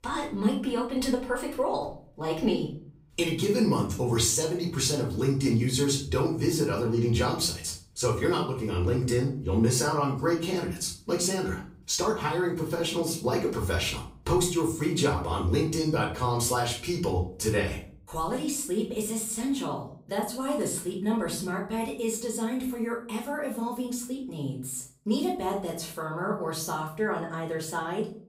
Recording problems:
off-mic speech; far
room echo; slight; dies away in 0.4 s

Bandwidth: 15.5 kHz